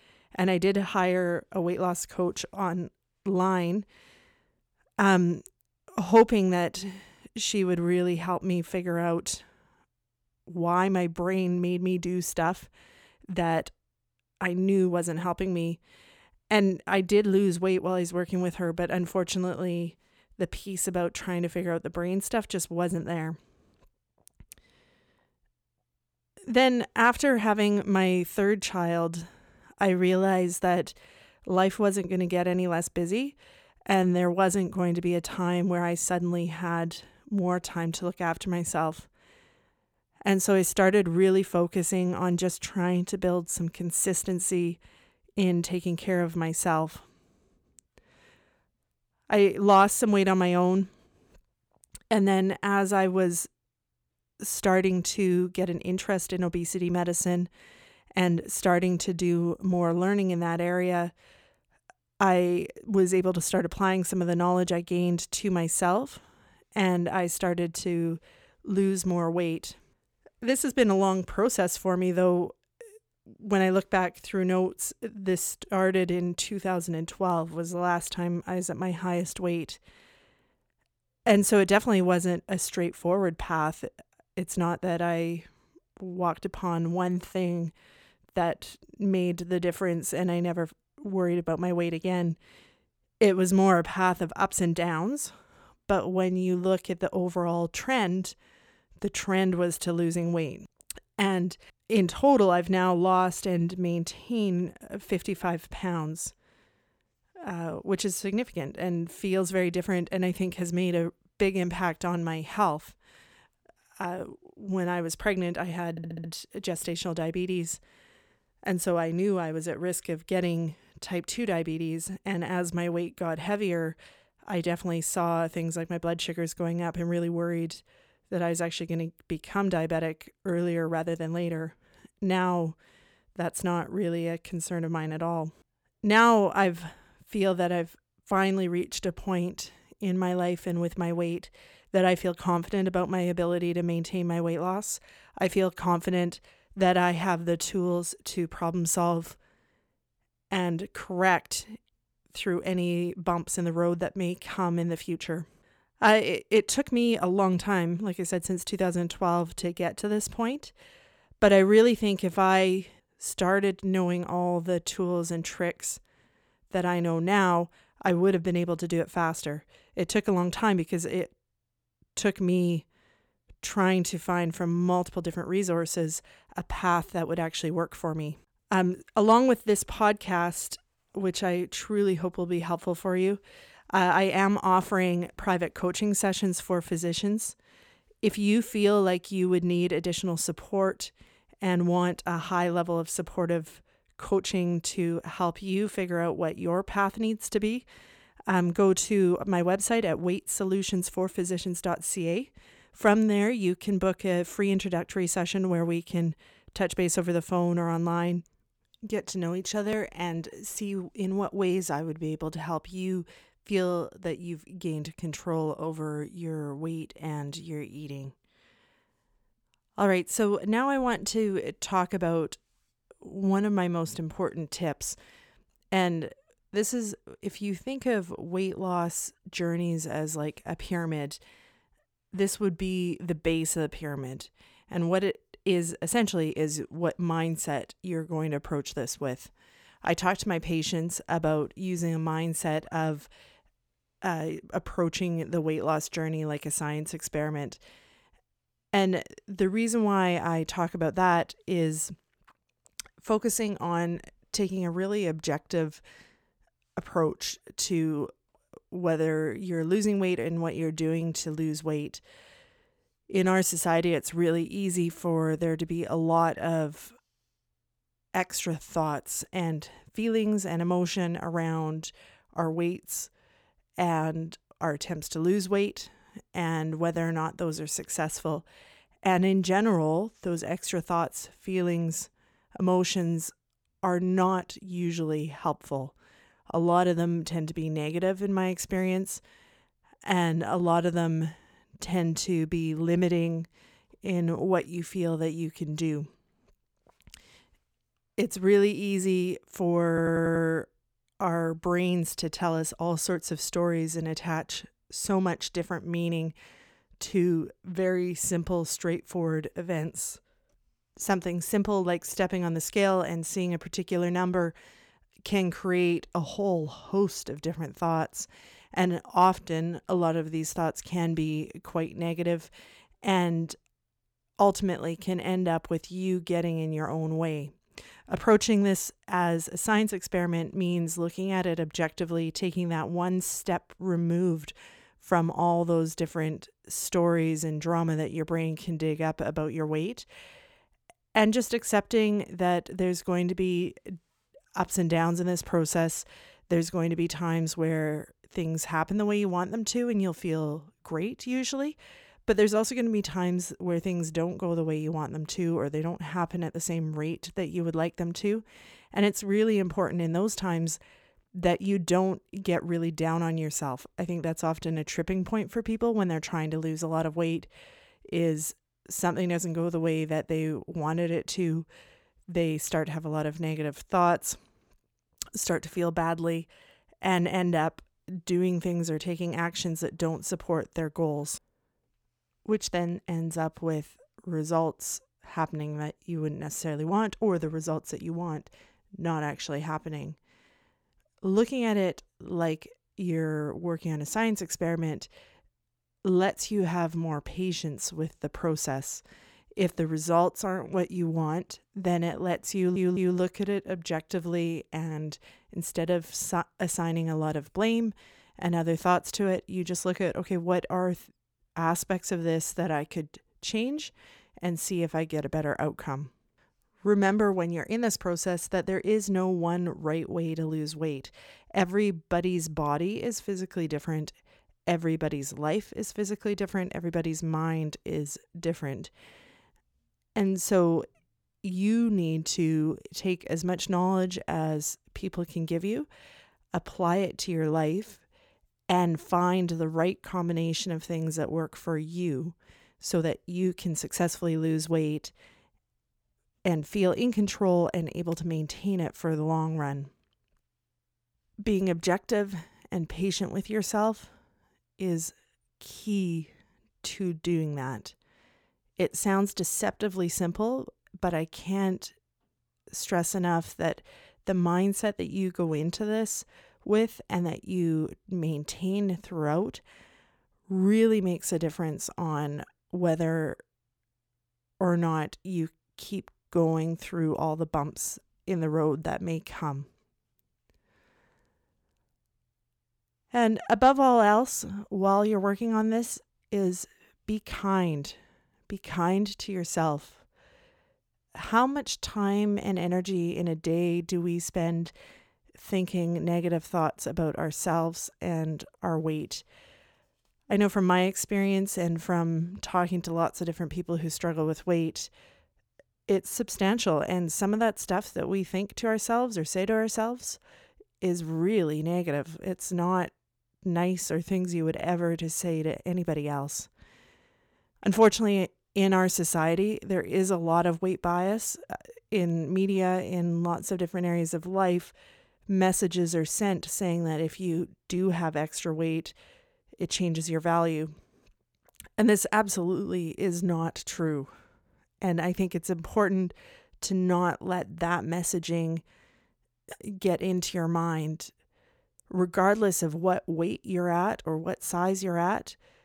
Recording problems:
audio stuttering; at 1:56, at 5:00 and at 6:43

